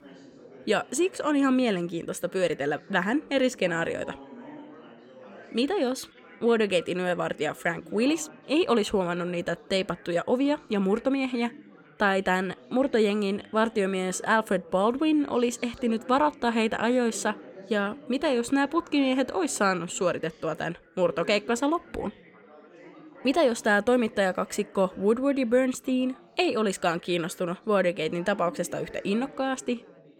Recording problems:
chatter from many people; faint; throughout; 20 dB below the speech

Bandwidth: 17 kHz